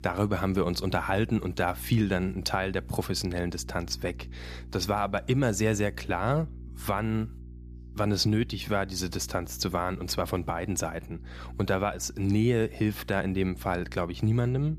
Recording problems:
electrical hum; faint; throughout; 60 Hz, 25 dB below the speech

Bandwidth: 14.5 kHz